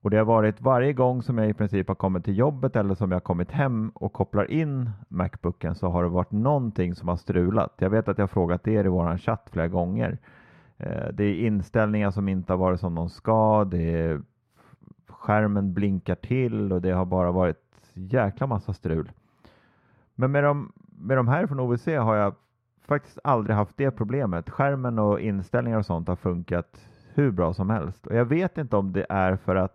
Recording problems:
muffled; slightly; fading above 3.5 kHz

